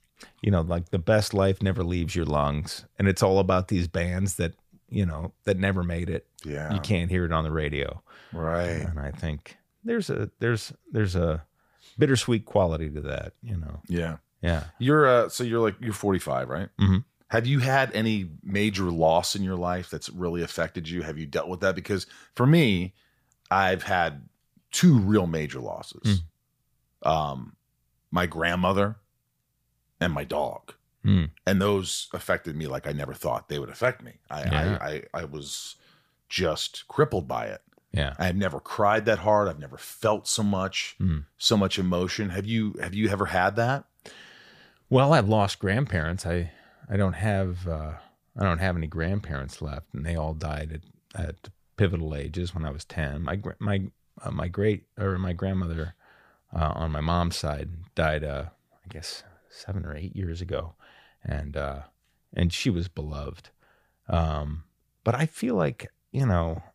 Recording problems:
none

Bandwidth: 15 kHz